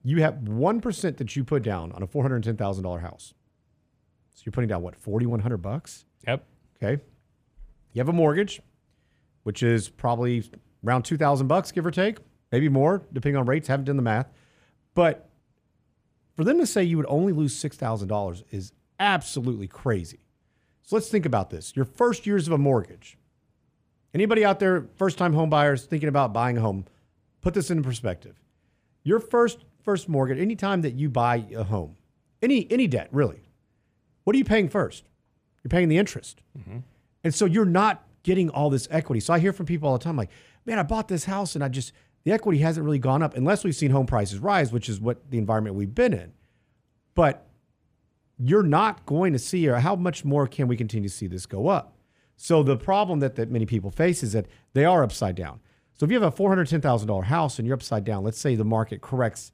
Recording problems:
none

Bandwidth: 15 kHz